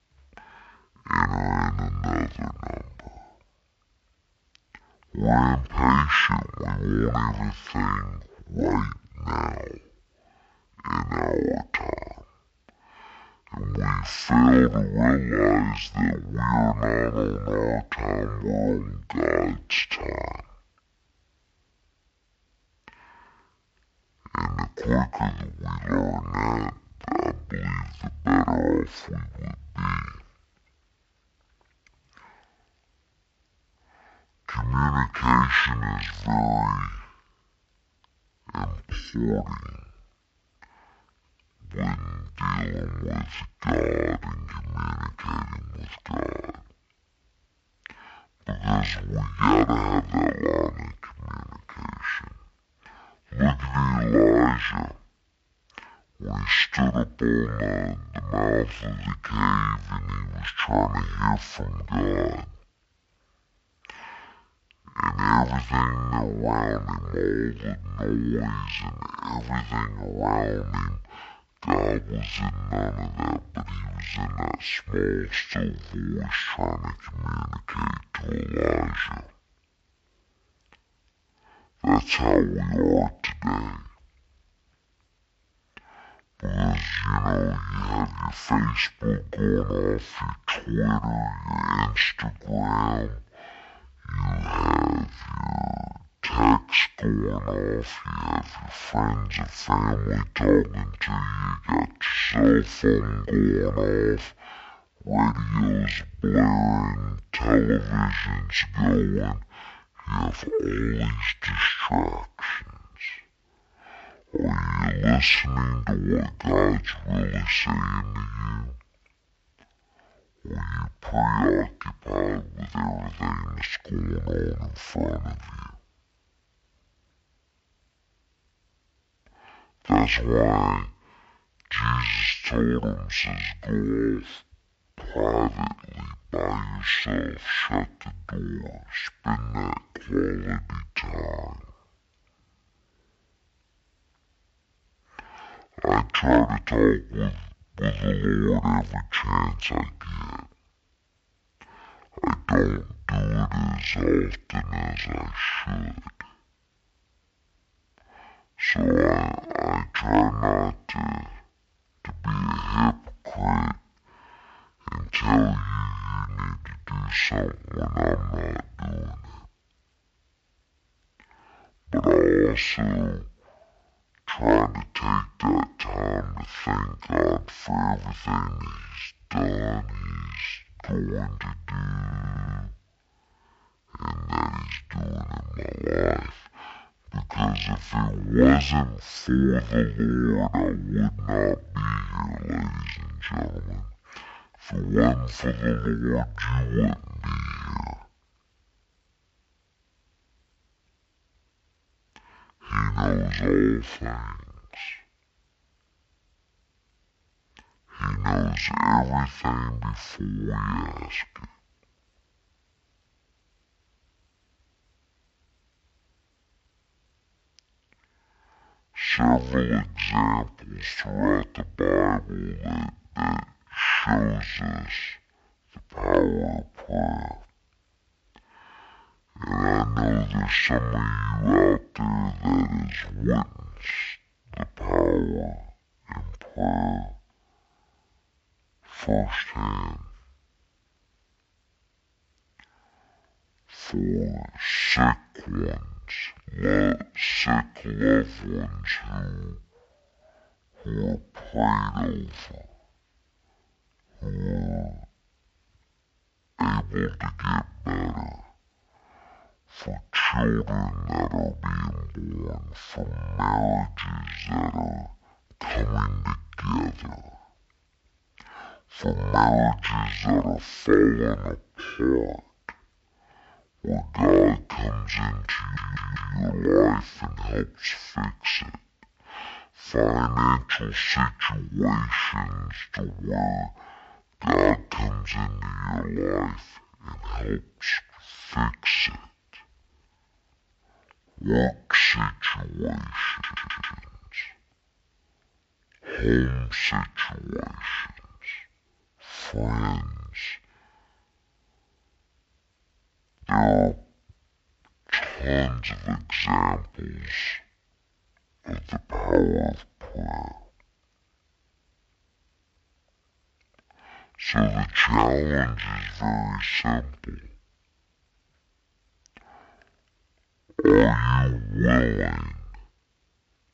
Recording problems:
wrong speed and pitch; too slow and too low; 0.5 times normal speed
audio stuttering; at 3:02, at 4:36 and at 4:53

